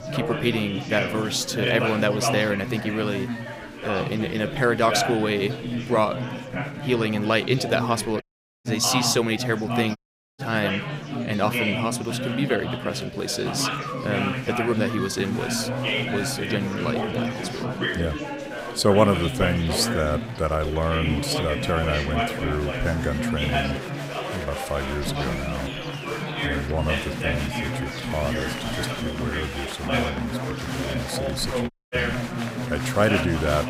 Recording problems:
chatter from many people; loud; throughout; 2 dB below the speech
audio cutting out; at 8 s, at 10 s and at 32 s

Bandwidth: 15.5 kHz